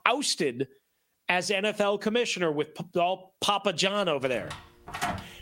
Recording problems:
squashed, flat; somewhat
door banging; noticeable; from 4.5 s on; peak 5 dB below the speech

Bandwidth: 16 kHz